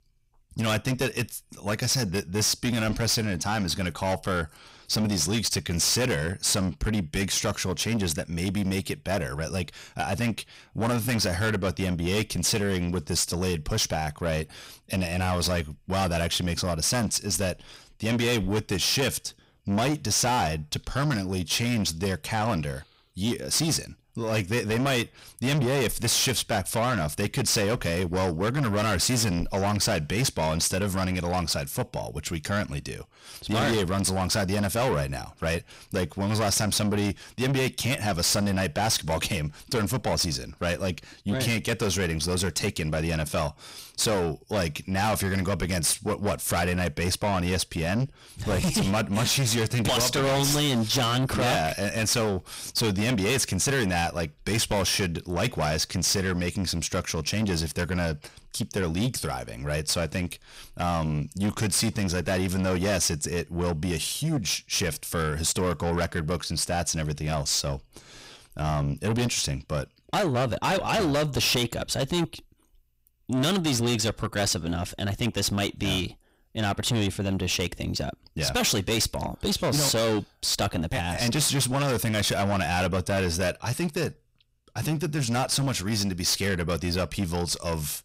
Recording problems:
distortion; heavy; 5 dB below the speech

